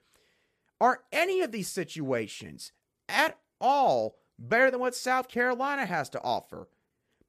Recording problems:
none

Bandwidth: 14.5 kHz